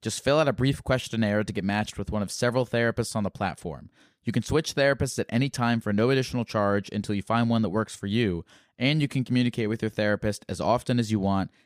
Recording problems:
none

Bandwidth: 15 kHz